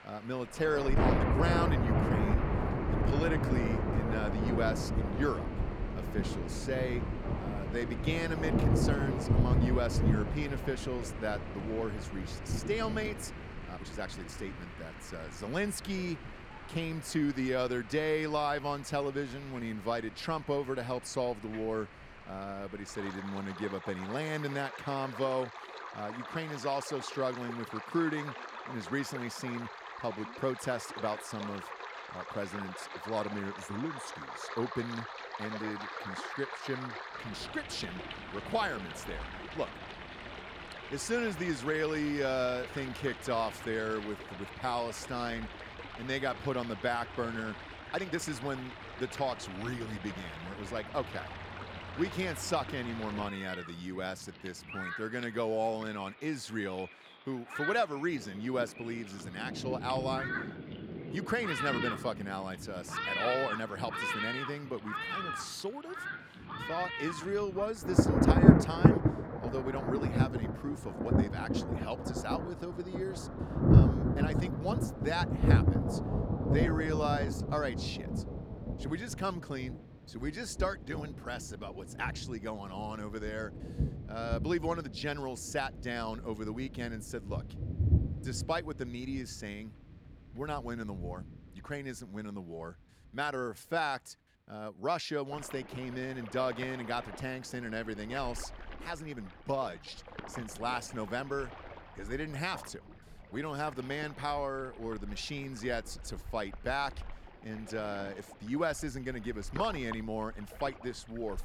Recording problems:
rain or running water; very loud; throughout; 2 dB above the speech
uneven, jittery; strongly; from 14 s to 1:40

